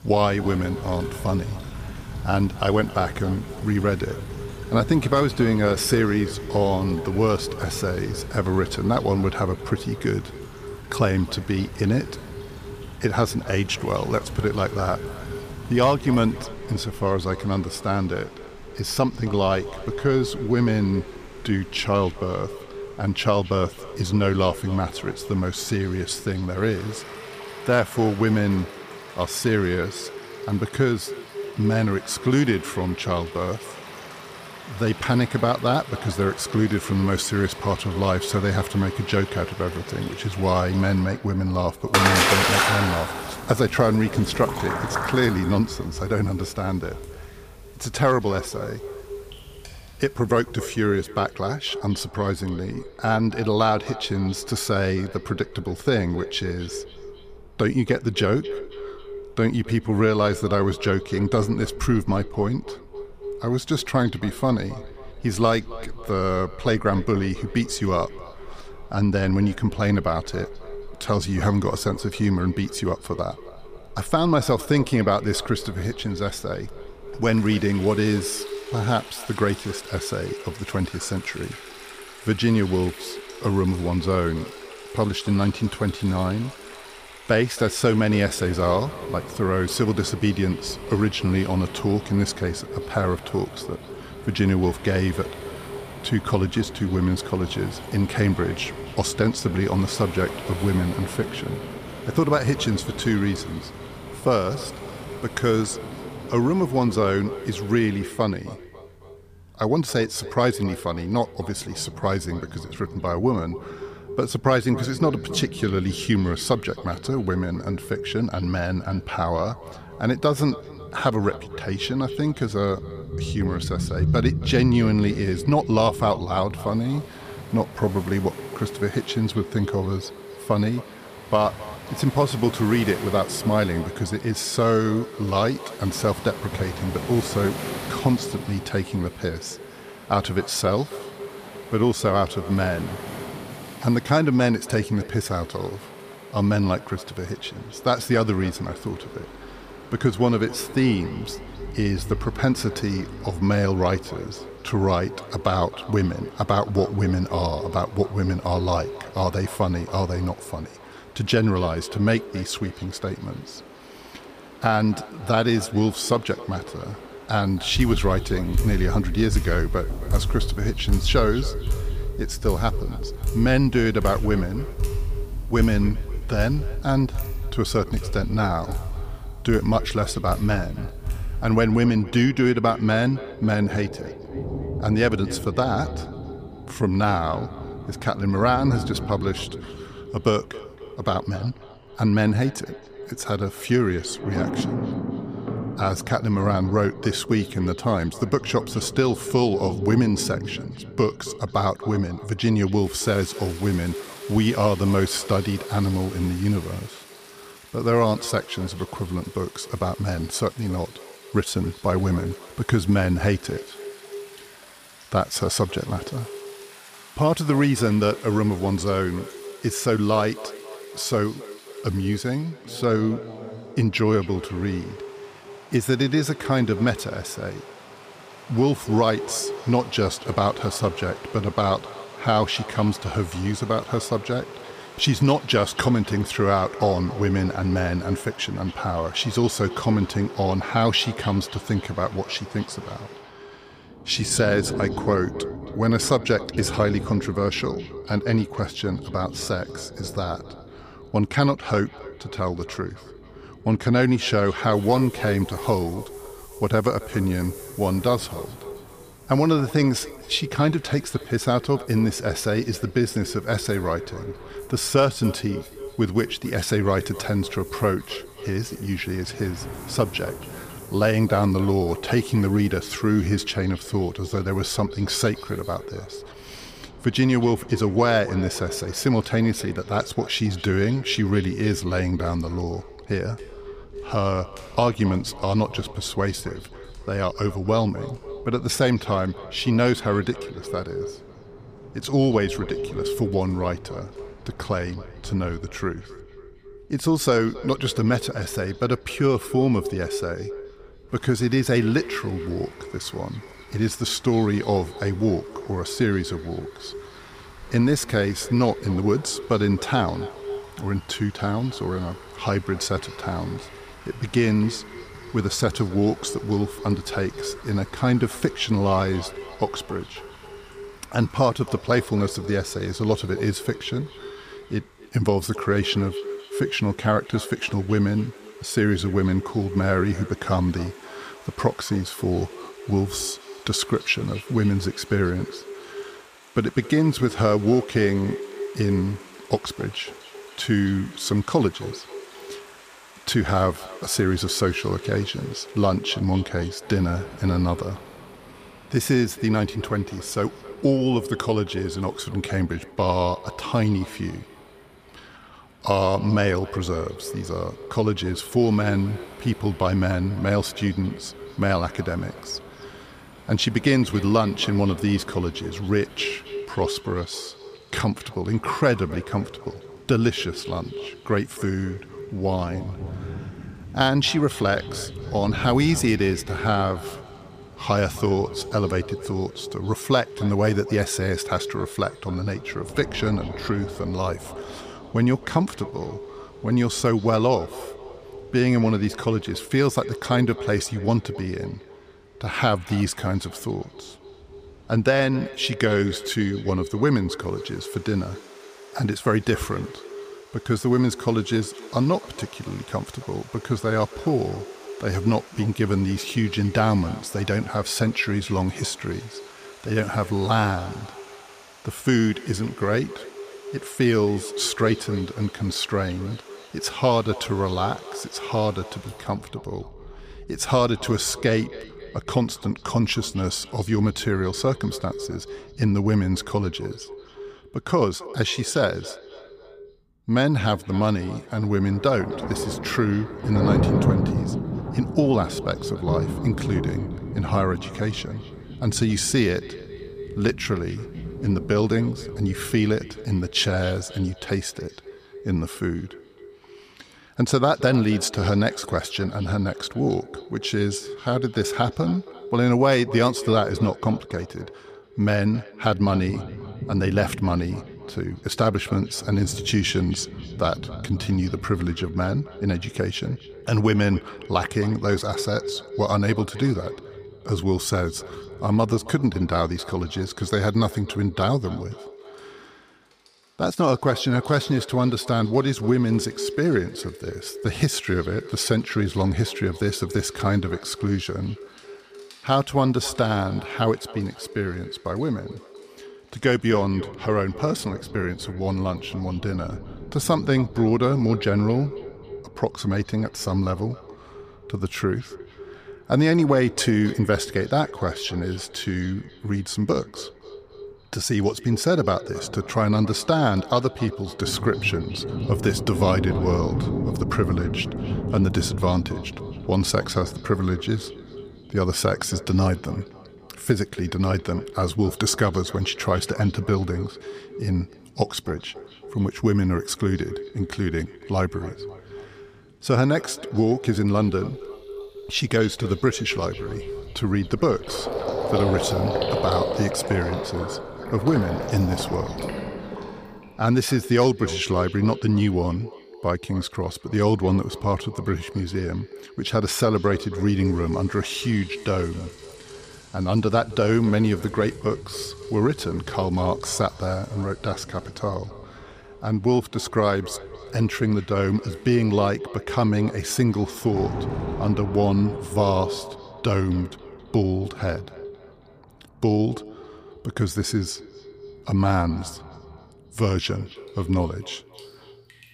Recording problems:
echo of what is said; noticeable; throughout; 270 ms later, 15 dB below the speech
rain or running water; noticeable; throughout; 10 dB below the speech

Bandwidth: 15 kHz